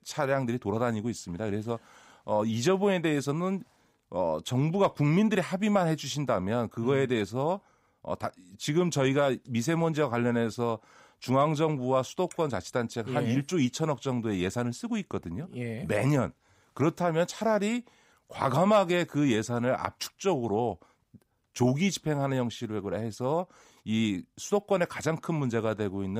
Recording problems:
abrupt cut into speech; at the end

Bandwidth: 15.5 kHz